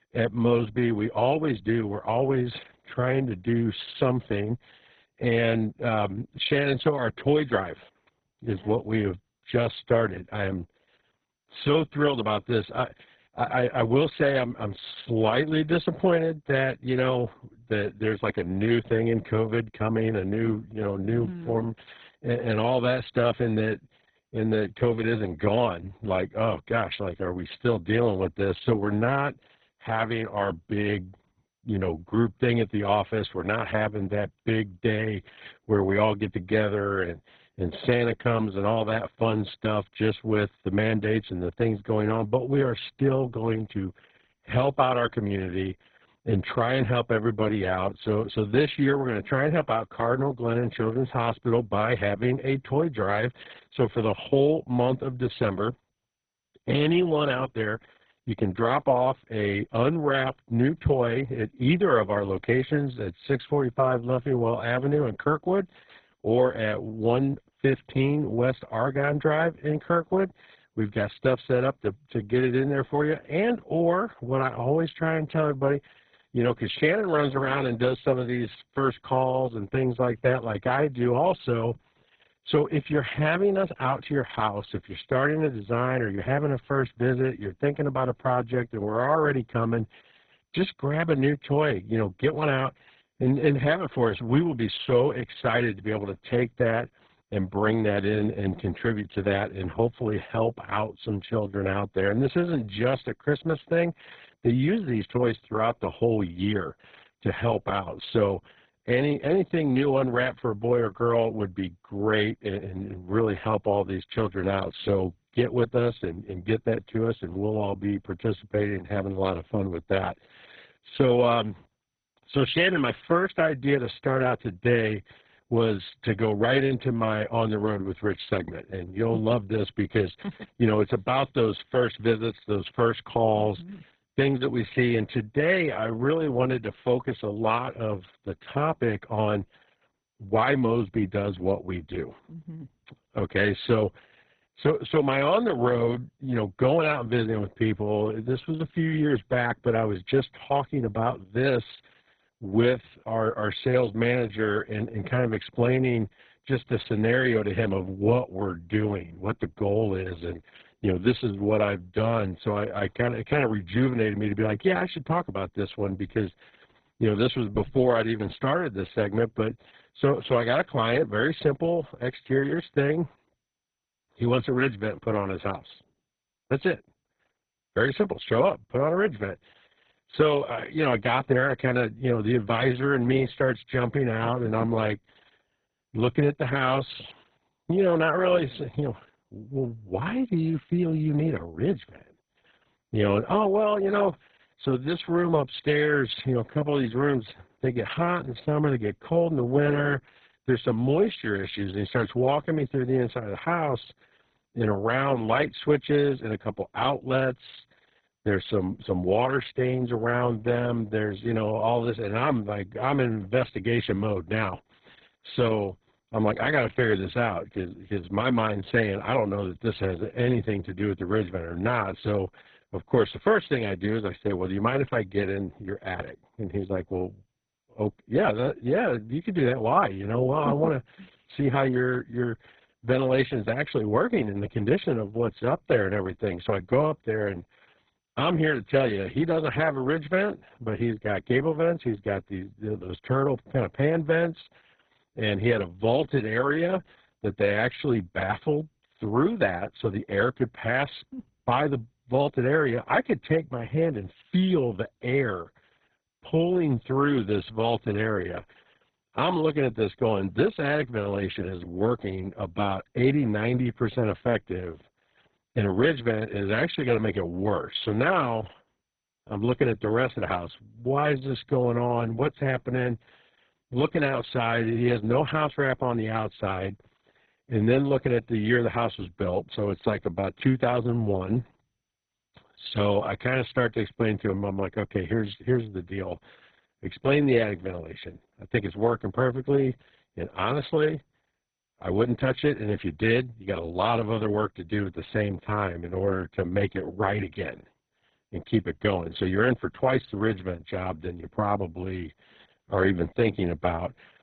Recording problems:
garbled, watery; badly; nothing above 4 kHz

